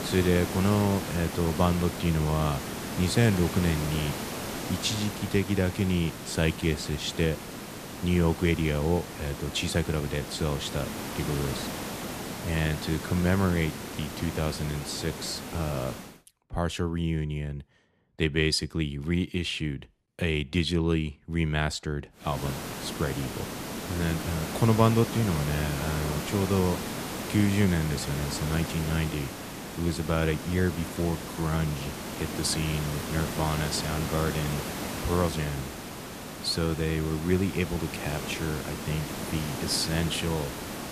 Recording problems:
hiss; loud; until 16 s and from 22 s on; 7 dB below the speech

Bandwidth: 14.5 kHz